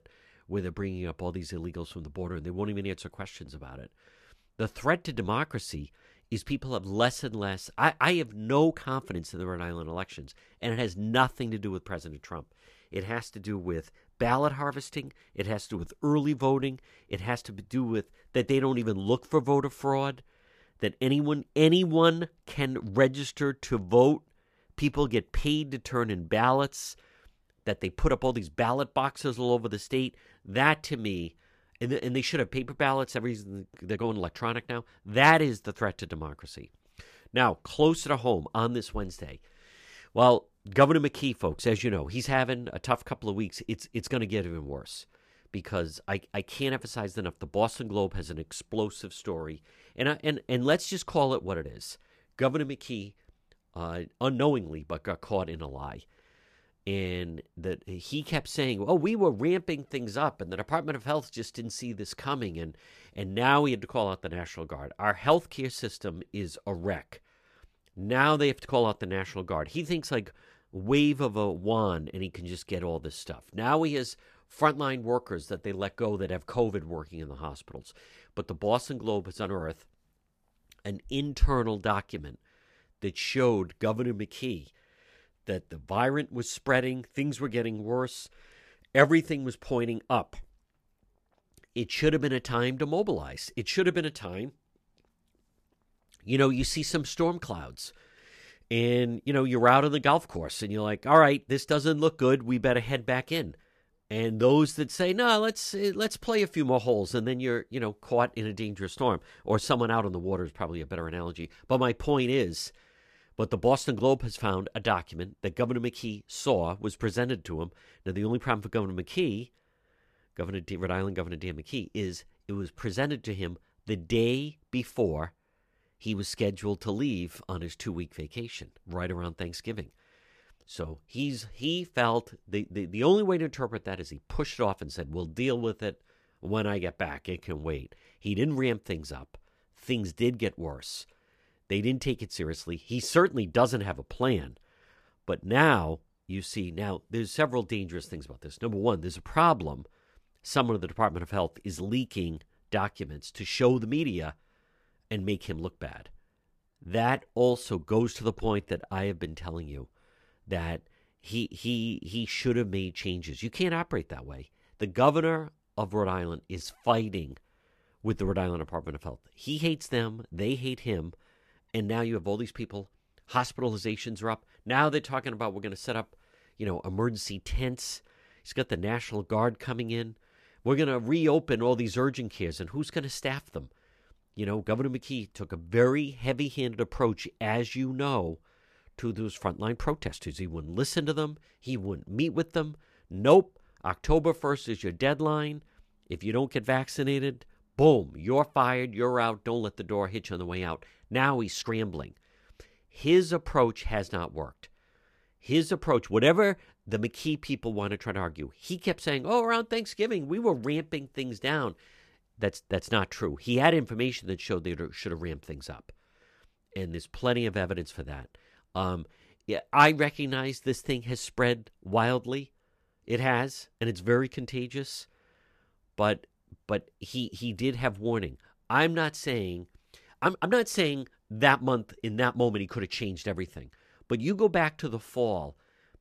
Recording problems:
uneven, jittery; strongly; from 34 s to 3:50

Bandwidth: 14.5 kHz